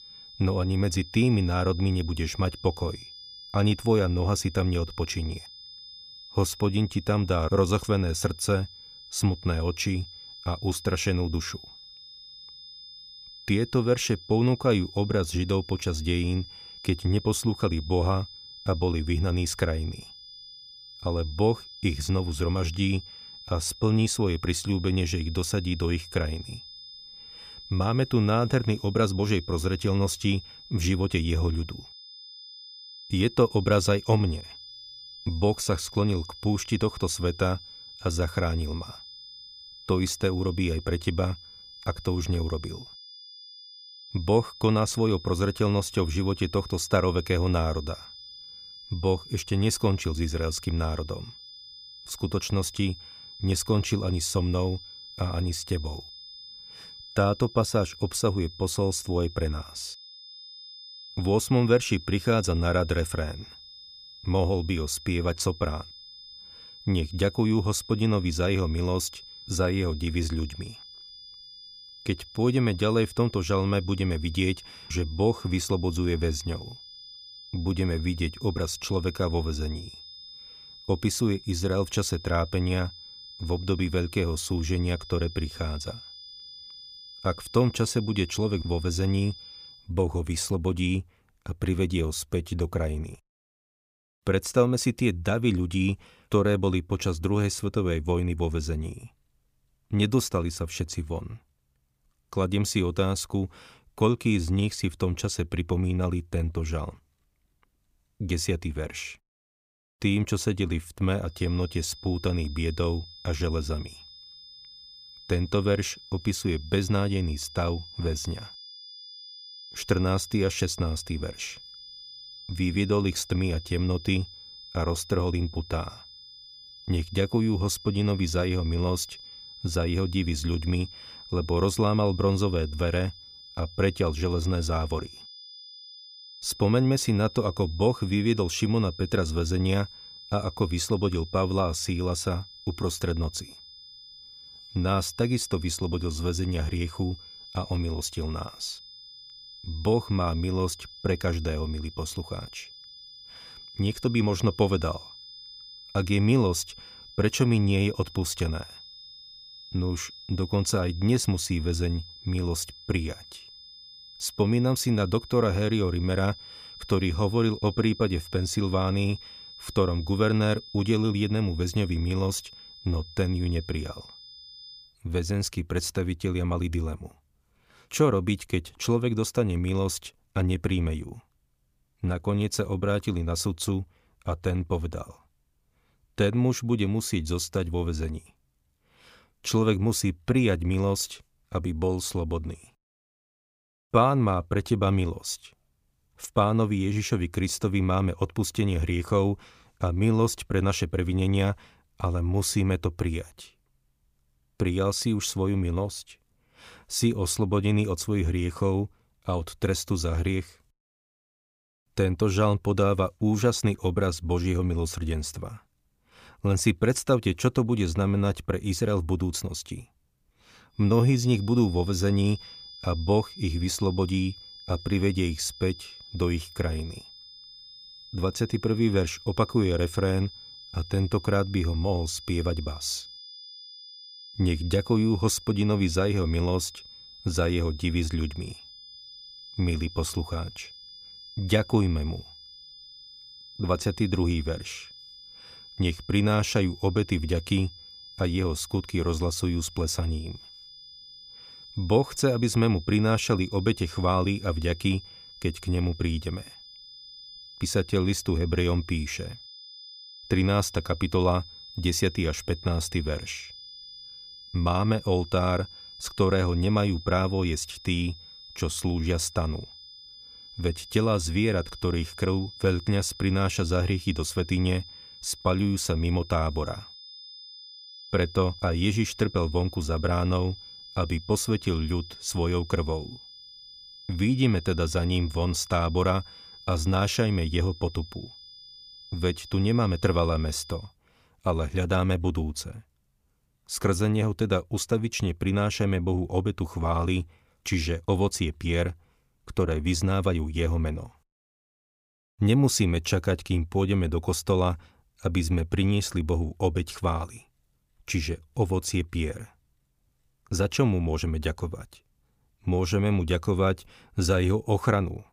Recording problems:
high-pitched whine; noticeable; until 1:30, from 1:51 to 2:55 and from 3:41 to 4:51; 5 kHz, 15 dB below the speech

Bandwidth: 15 kHz